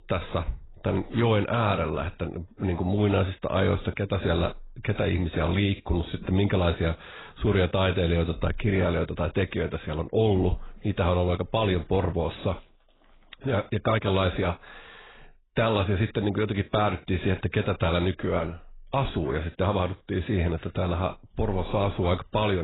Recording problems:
garbled, watery; badly; nothing above 4 kHz
abrupt cut into speech; at the end

